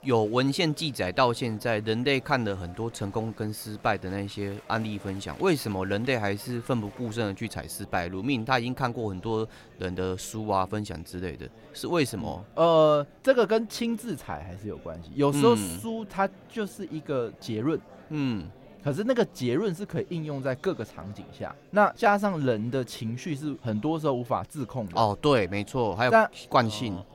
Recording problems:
murmuring crowd; faint; throughout; 25 dB below the speech

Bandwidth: 16 kHz